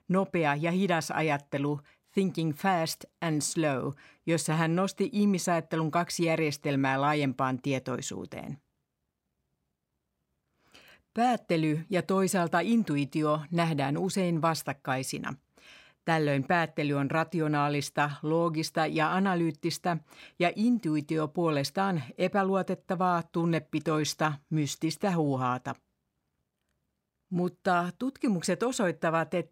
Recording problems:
none

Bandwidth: 16 kHz